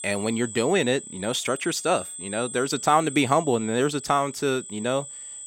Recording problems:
high-pitched whine; noticeable; throughout; 8 kHz, 10 dB below the speech

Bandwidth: 16 kHz